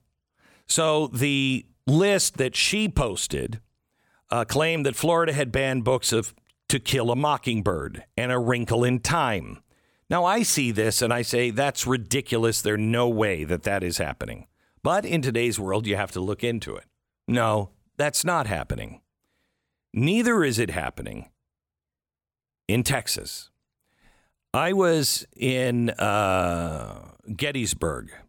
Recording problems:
none

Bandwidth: 17.5 kHz